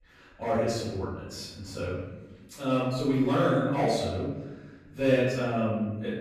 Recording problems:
room echo; strong; dies away in 1.1 s
off-mic speech; far

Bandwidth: 14.5 kHz